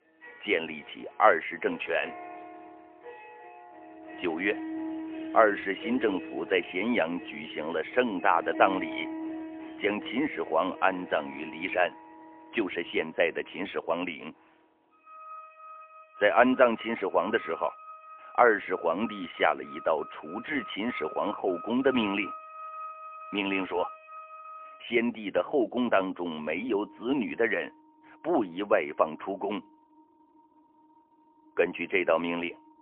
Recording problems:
phone-call audio; poor line; nothing above 3 kHz
background music; noticeable; throughout; 15 dB below the speech

